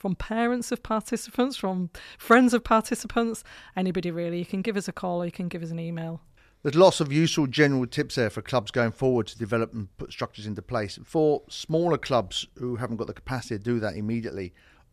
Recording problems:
none

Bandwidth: 14 kHz